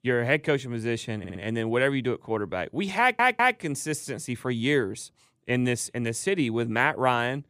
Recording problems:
audio stuttering; at 1 s and at 3 s

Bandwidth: 14.5 kHz